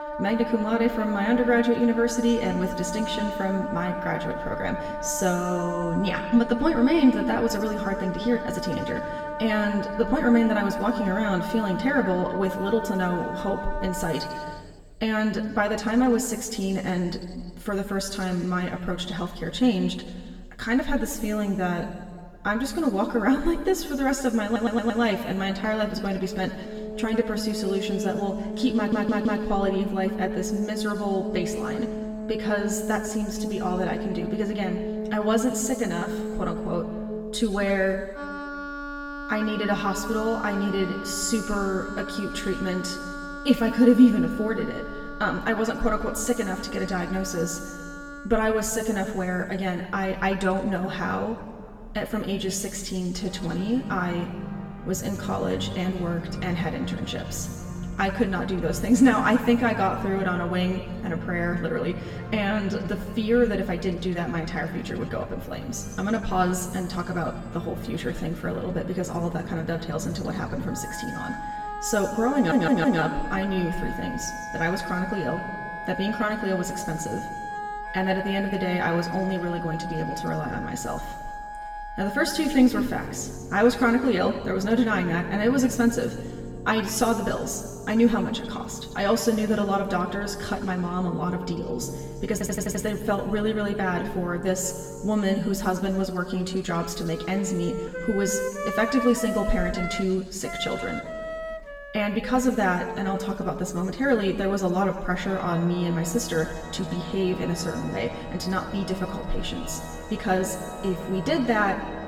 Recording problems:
room echo; slight; dies away in 1.5 s
off-mic speech; somewhat distant
background music; loud; throughout; 9 dB below the speech
audio stuttering; 4 times, first at 24 s

